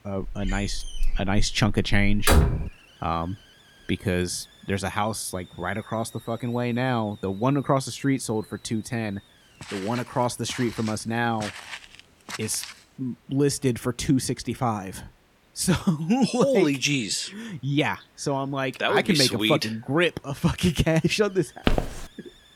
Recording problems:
hiss; faint; throughout; 30 dB below the speech
door banging; loud; until 2.5 s; peak 5 dB above the speech
footsteps; noticeable; from 9.5 to 13 s and at 22 s; peak 1 dB below the speech

